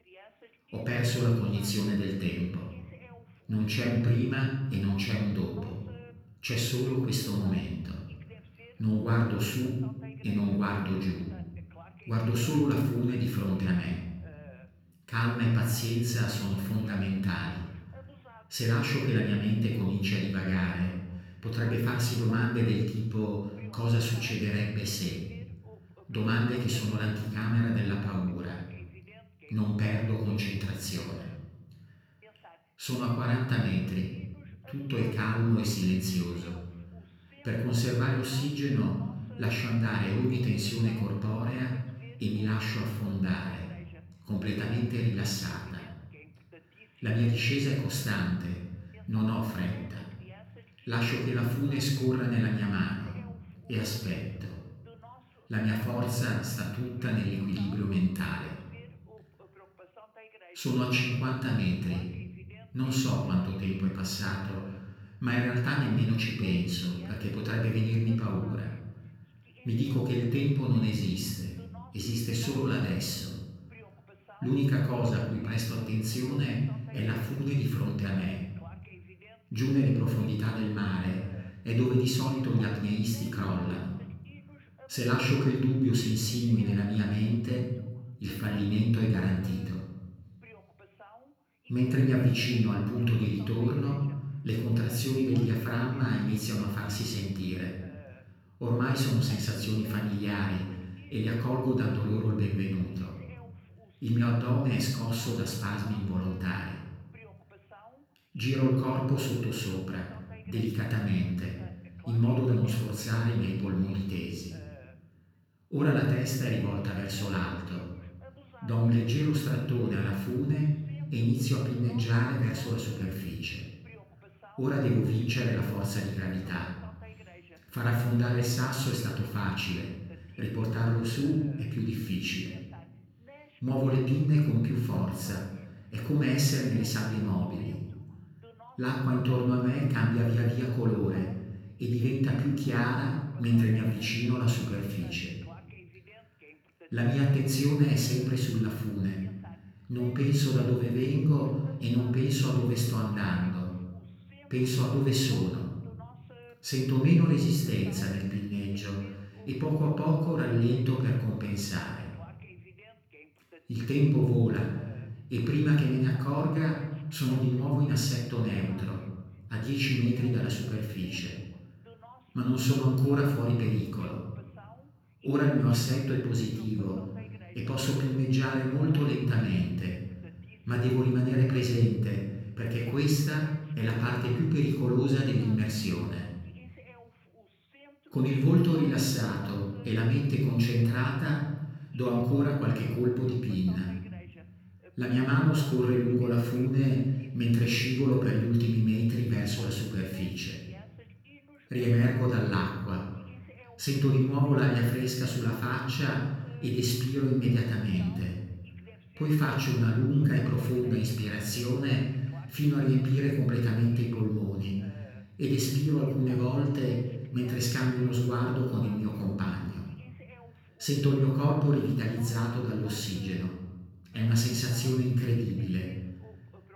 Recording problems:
off-mic speech; far
room echo; noticeable; dies away in 1.1 s
voice in the background; faint; throughout; 25 dB below the speech

